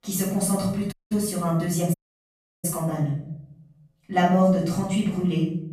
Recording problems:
off-mic speech; far
room echo; noticeable; dies away in 0.7 s
audio cutting out; at 1 s and at 2 s for 0.5 s

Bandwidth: 14.5 kHz